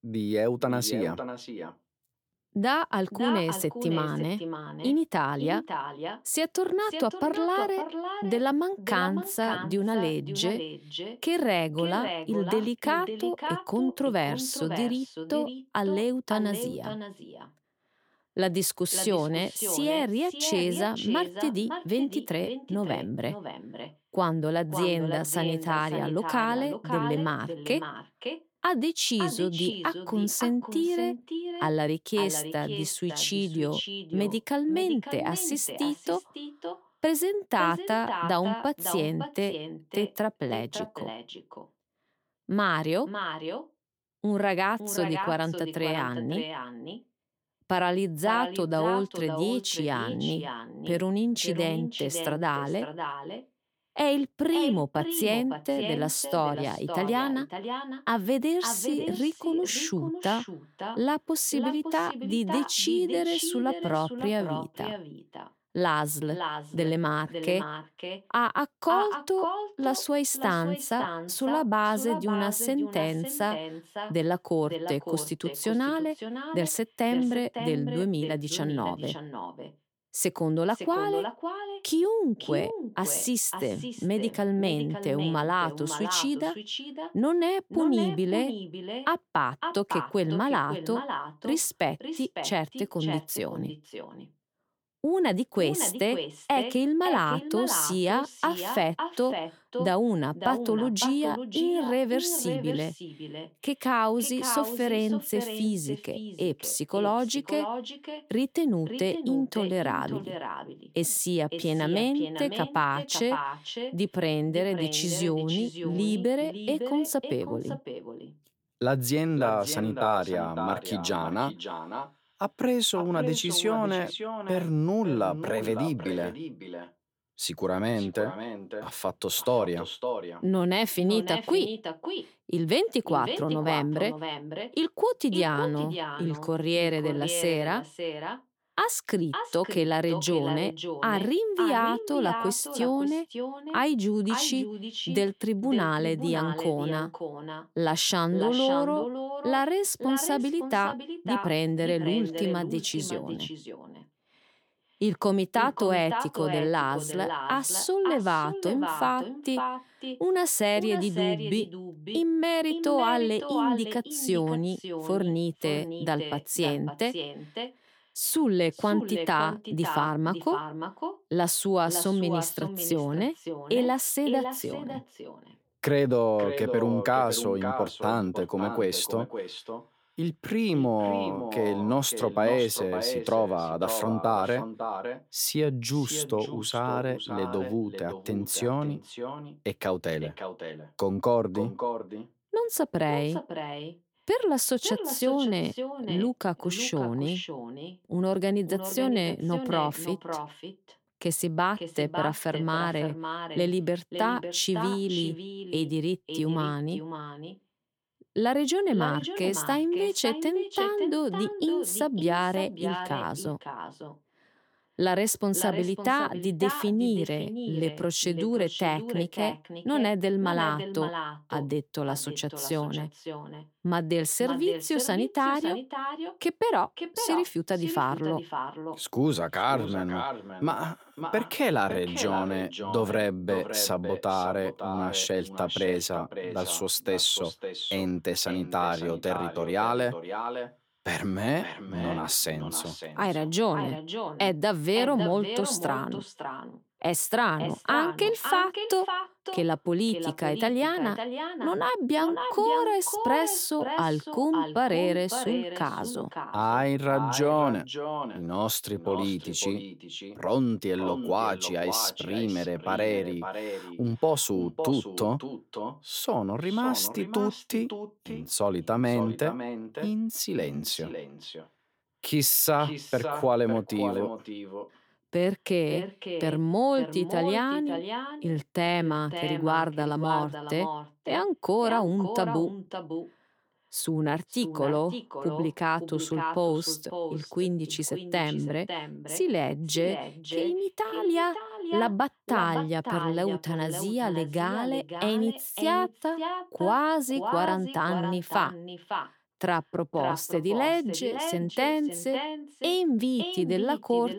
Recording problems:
echo of what is said; strong; throughout; 560 ms later, 8 dB below the speech

